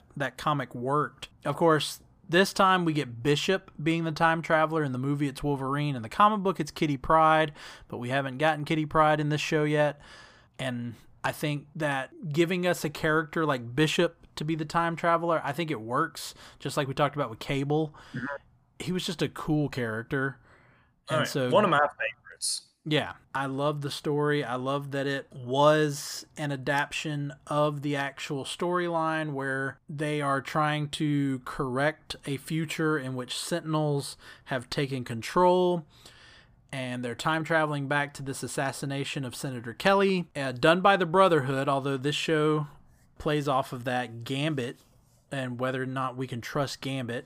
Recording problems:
none

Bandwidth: 15 kHz